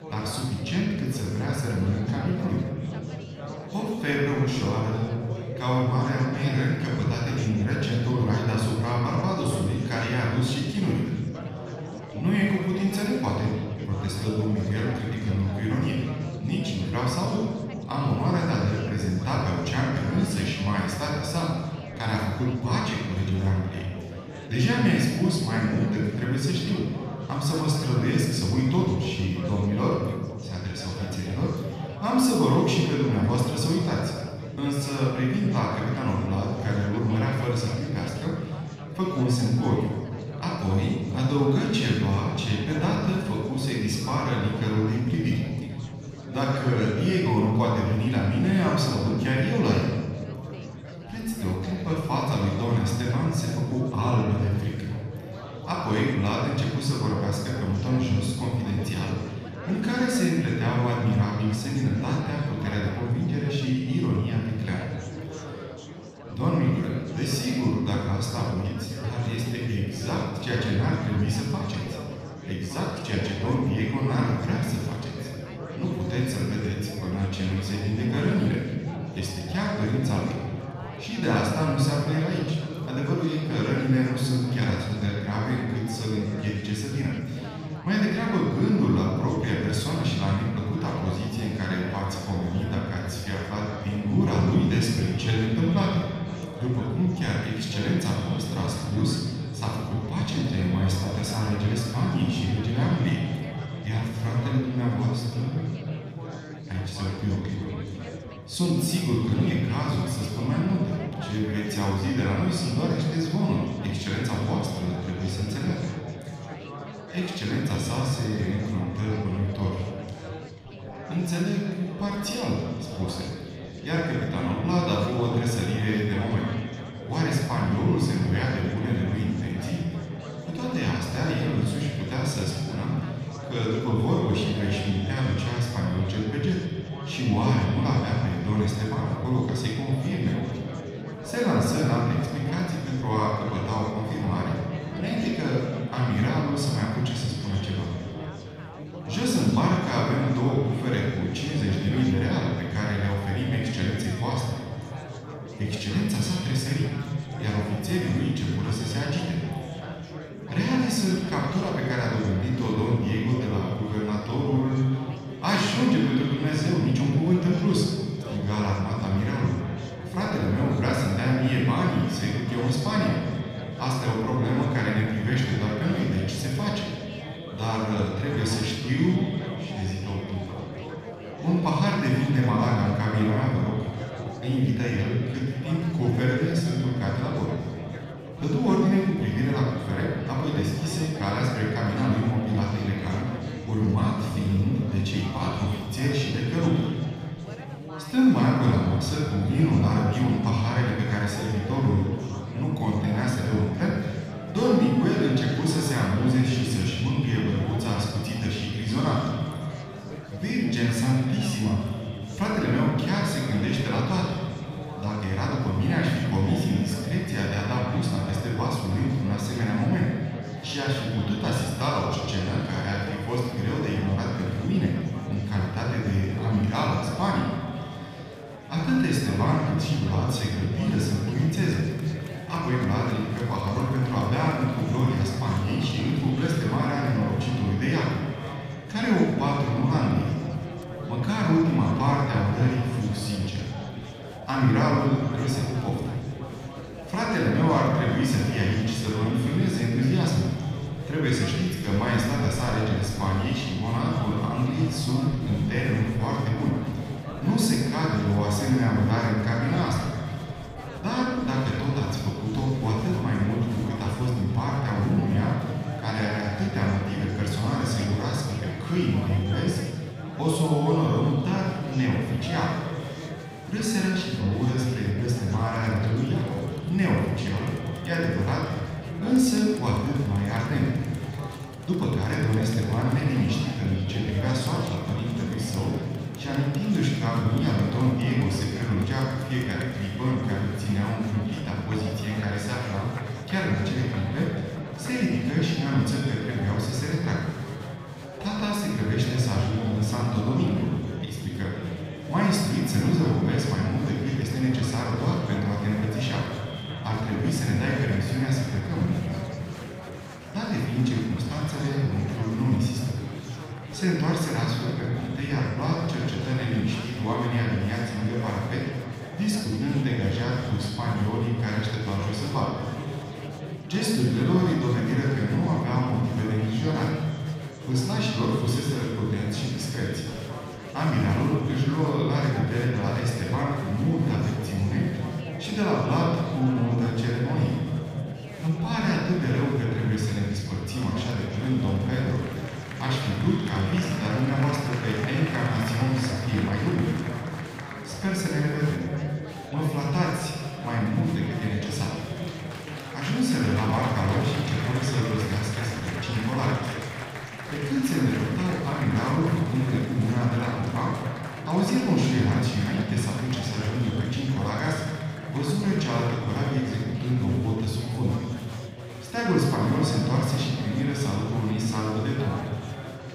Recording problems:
room echo; strong; dies away in 1.9 s
off-mic speech; far
echo of what is said; faint; from 1:32 on; 140 ms later, 20 dB below the speech
chatter from many people; noticeable; throughout; 15 dB below the speech

